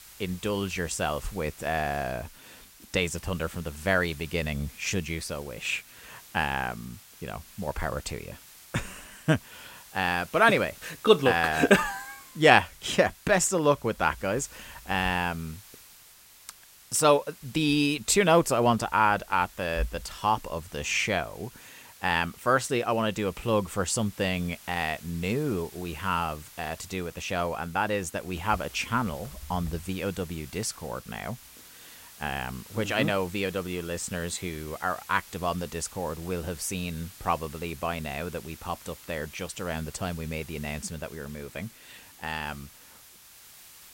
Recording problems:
hiss; noticeable; throughout; 20 dB below the speech

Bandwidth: 16 kHz